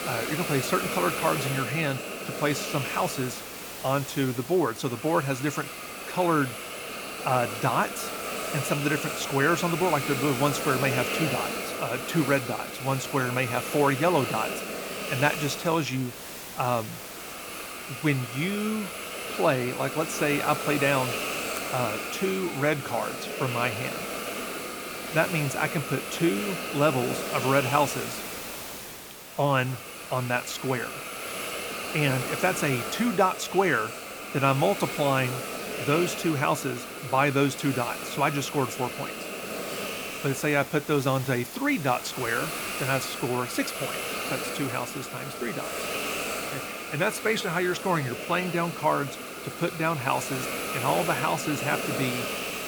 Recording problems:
hiss; loud; throughout; 5 dB below the speech

